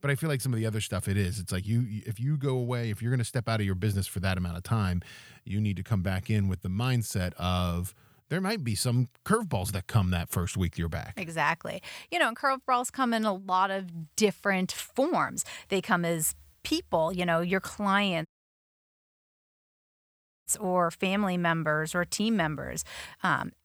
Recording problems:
audio cutting out; at 18 s for 2 s

